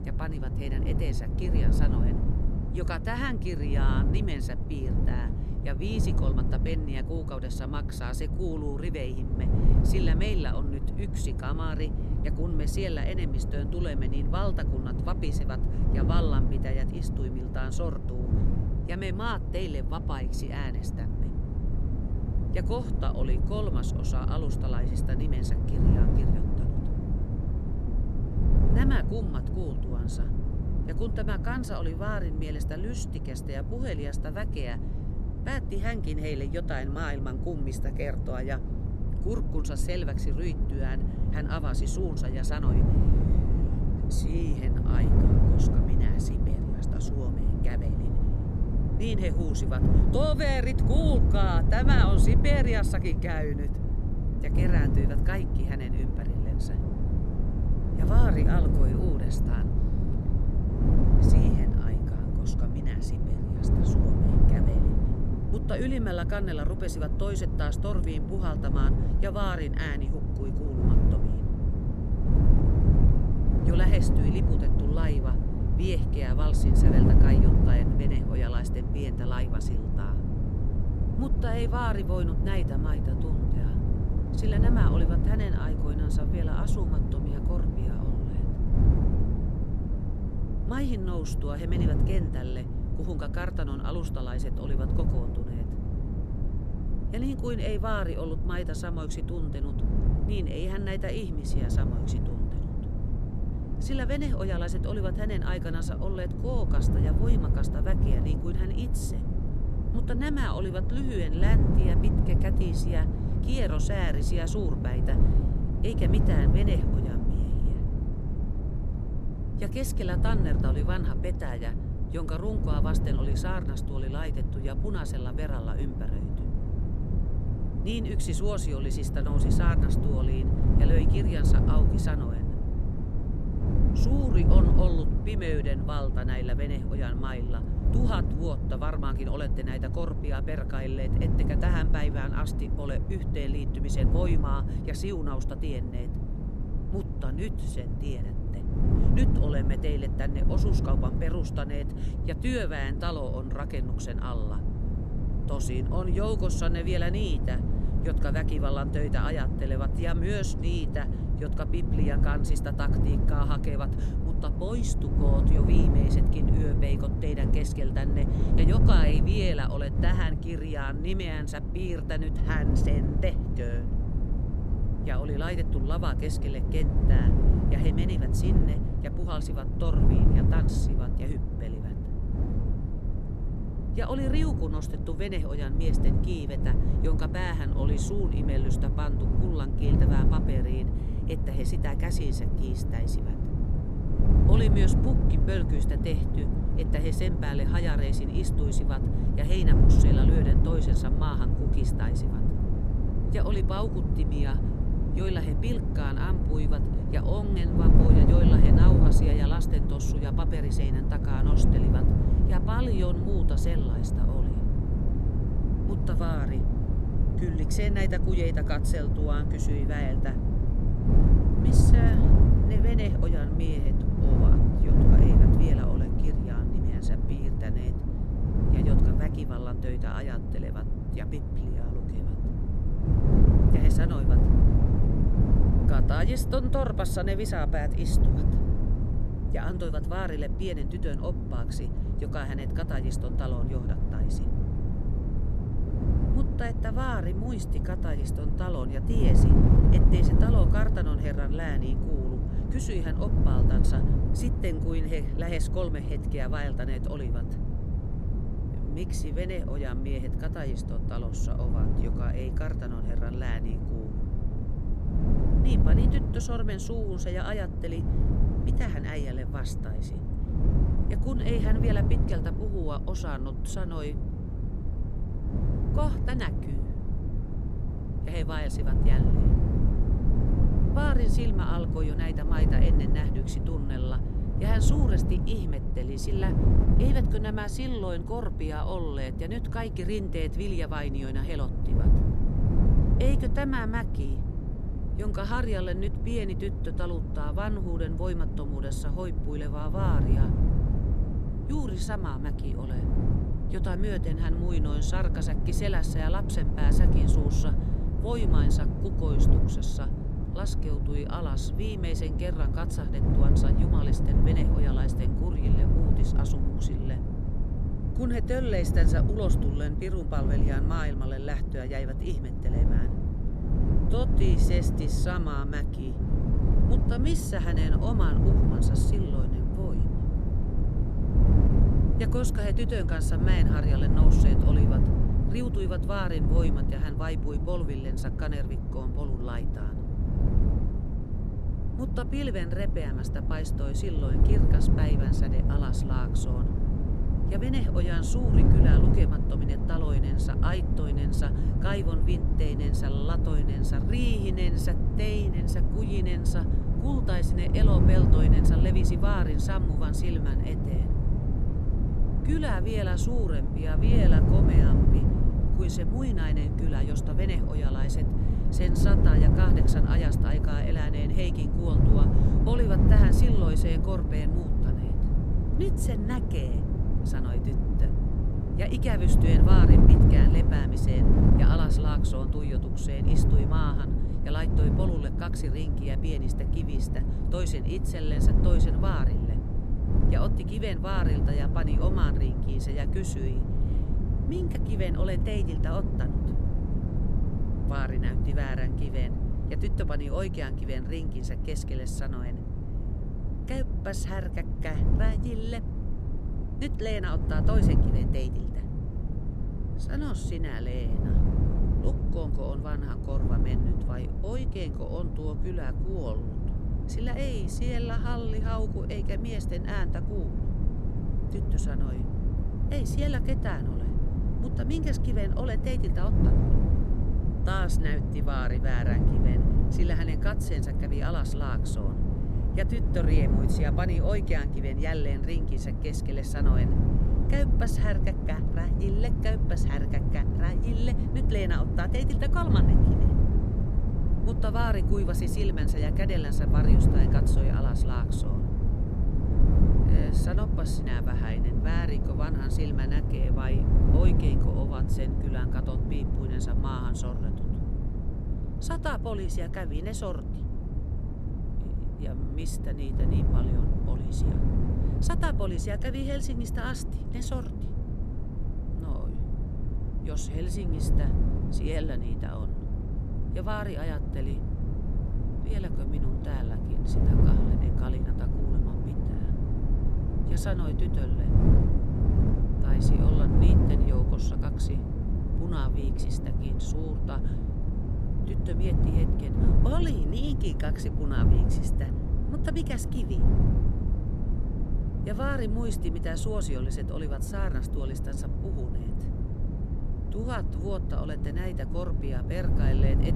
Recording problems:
wind noise on the microphone; heavy; 1 dB below the speech

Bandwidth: 13.5 kHz